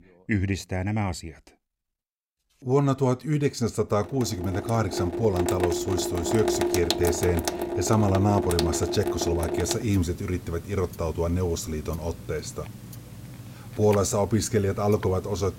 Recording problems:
household noises; loud; from 4.5 s on; 4 dB below the speech

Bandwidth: 16 kHz